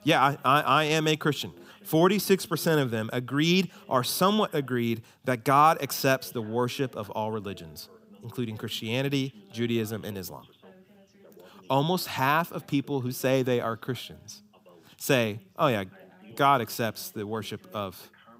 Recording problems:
background chatter; faint; throughout; 2 voices, 30 dB below the speech

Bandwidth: 15.5 kHz